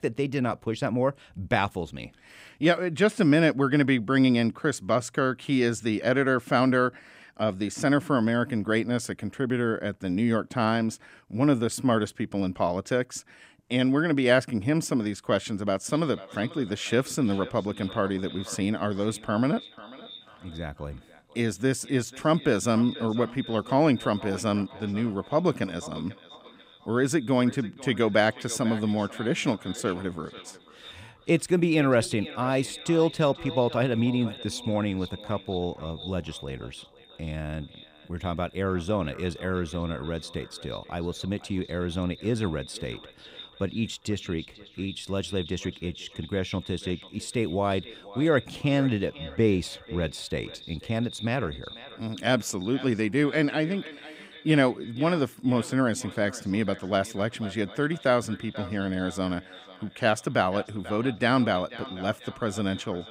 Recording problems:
echo of what is said; noticeable; from 16 s on; 490 ms later, 15 dB below the speech

